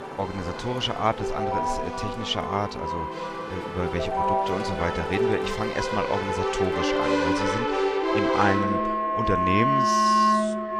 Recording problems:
background music; very loud; throughout; 4 dB above the speech
traffic noise; noticeable; throughout; 10 dB below the speech

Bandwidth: 15.5 kHz